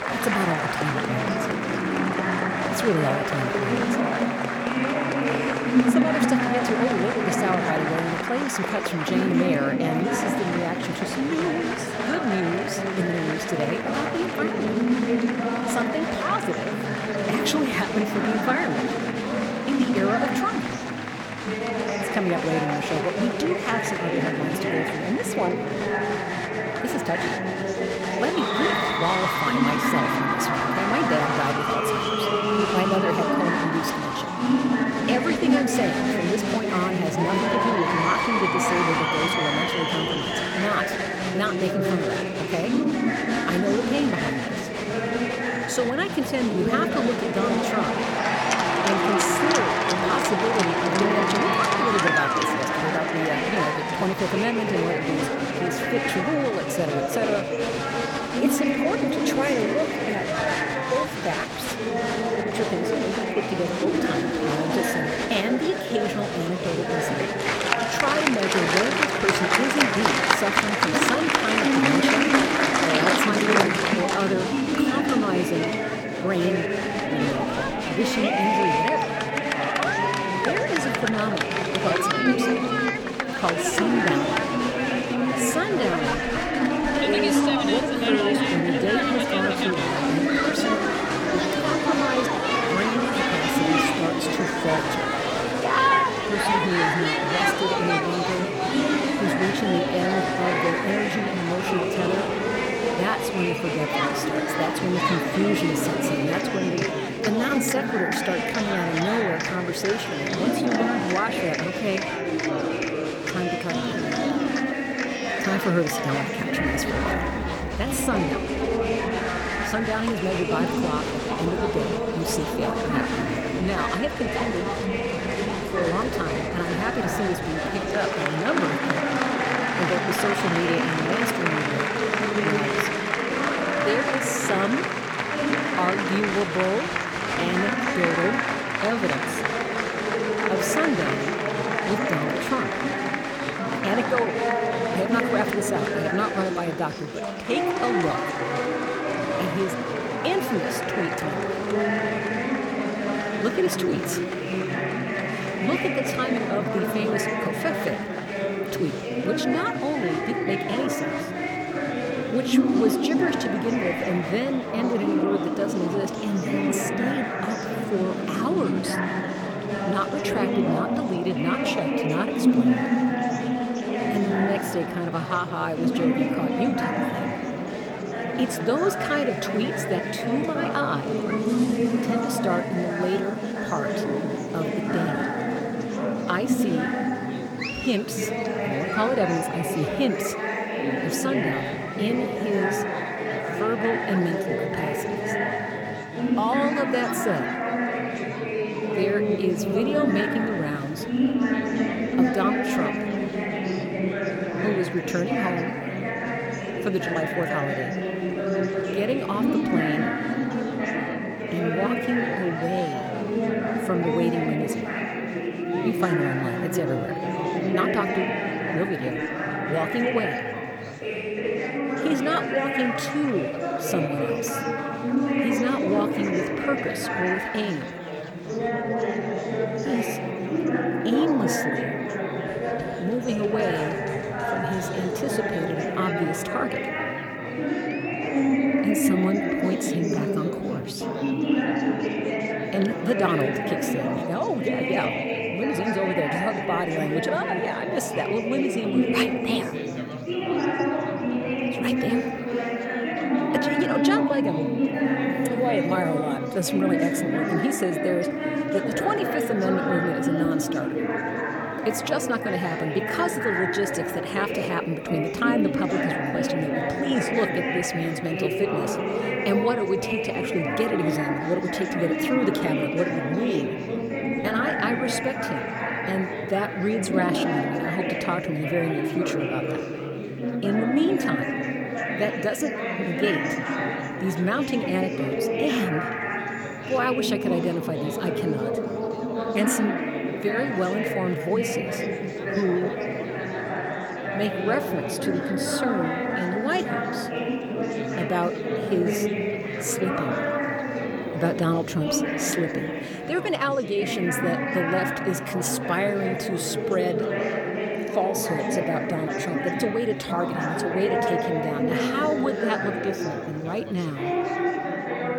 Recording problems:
chatter from many people; very loud; throughout; 3 dB above the speech

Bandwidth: 18 kHz